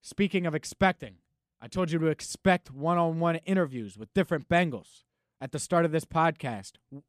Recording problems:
none

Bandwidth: 14.5 kHz